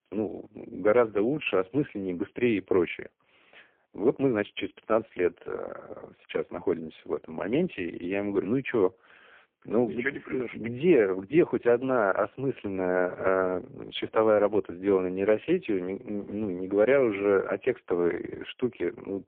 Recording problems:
phone-call audio; poor line; nothing above 3.5 kHz

